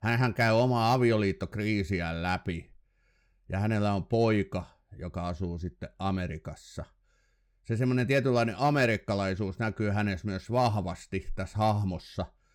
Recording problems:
none

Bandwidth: 17.5 kHz